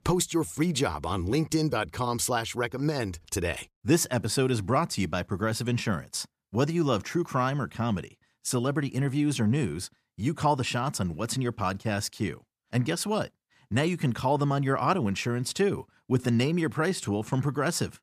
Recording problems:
none

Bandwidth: 14.5 kHz